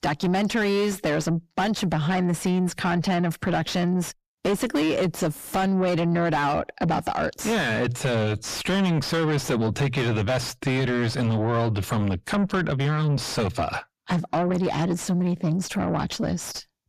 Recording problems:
distortion; heavy; 5 dB below the speech

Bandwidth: 14.5 kHz